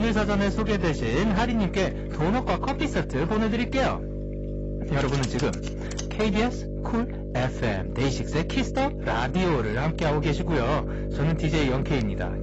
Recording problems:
distortion; heavy; 18% of the sound clipped
garbled, watery; badly; nothing above 7.5 kHz
electrical hum; noticeable; throughout; 50 Hz, 10 dB below the speech
household noises; noticeable; until 6.5 s; 10 dB below the speech
abrupt cut into speech; at the start

